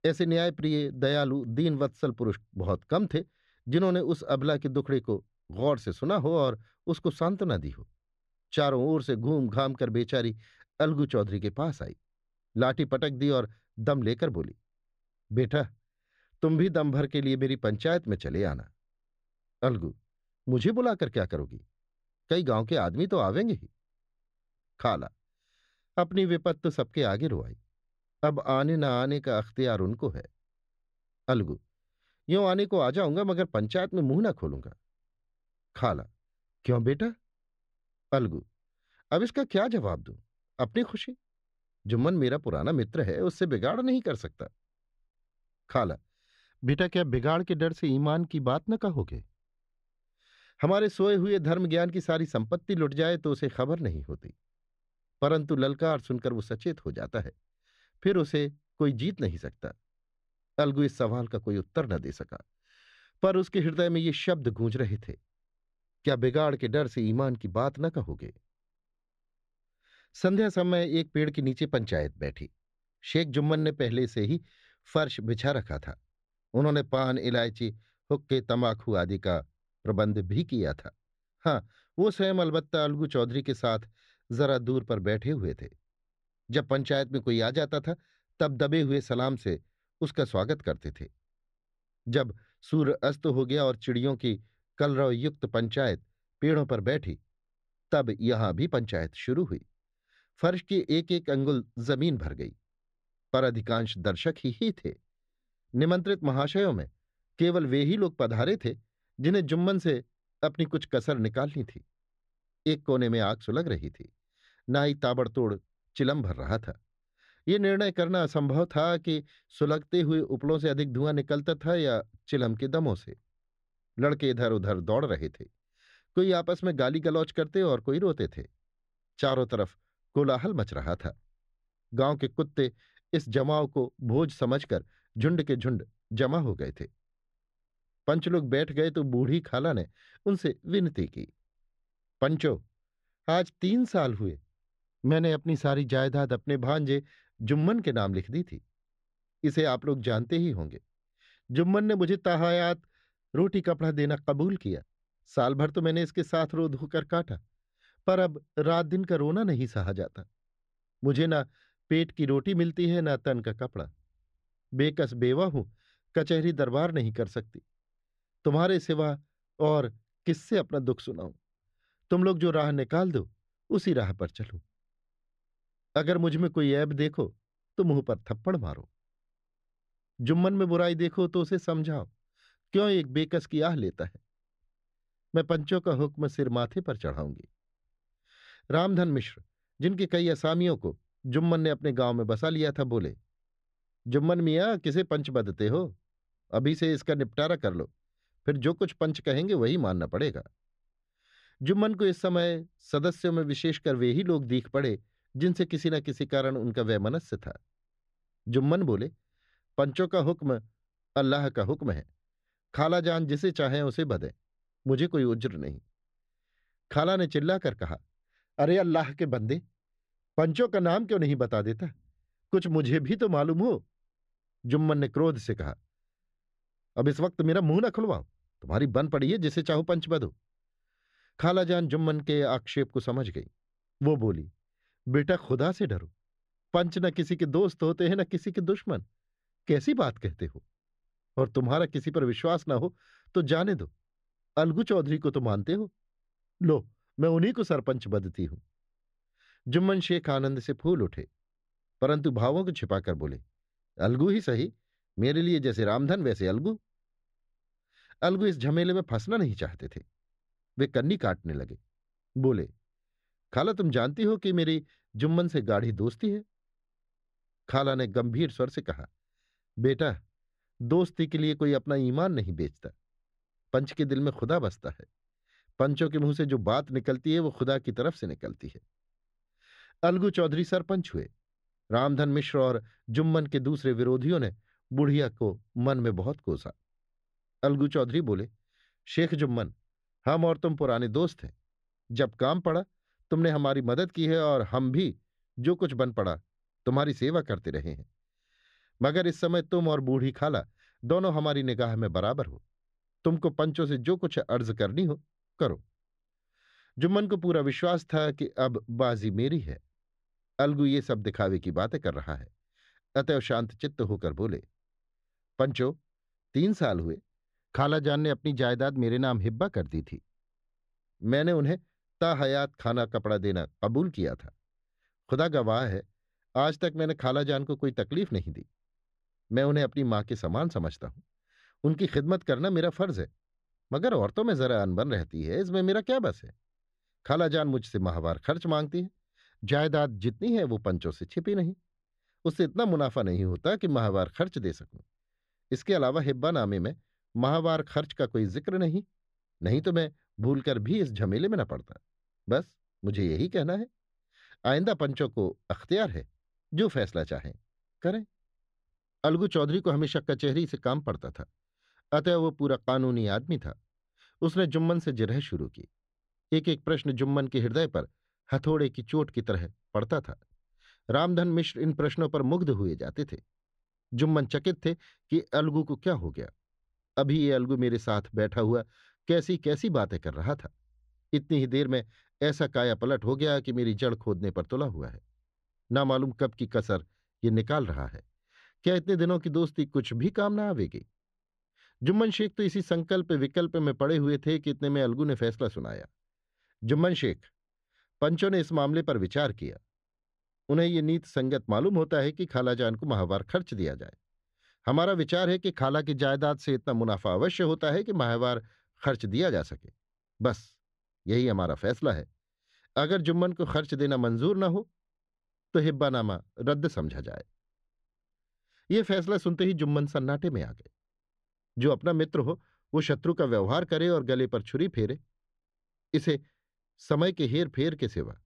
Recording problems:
muffled; slightly; fading above 2.5 kHz

